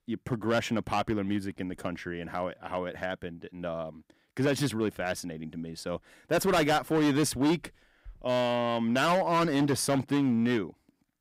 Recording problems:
distortion; heavy; 8% of the sound clipped

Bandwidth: 15.5 kHz